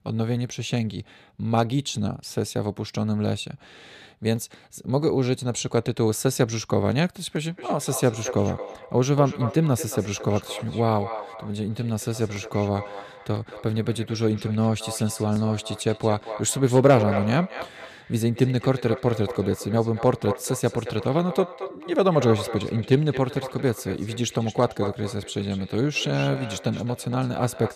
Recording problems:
echo of what is said; noticeable; from 7.5 s on; 230 ms later, 10 dB below the speech

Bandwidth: 14.5 kHz